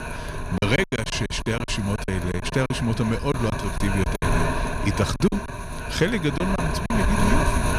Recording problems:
wind noise on the microphone; heavy; 1 dB below the speech
choppy; very; from 0.5 to 2.5 s, at 3.5 s and from 5 to 7 s; 15% of the speech affected

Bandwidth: 14.5 kHz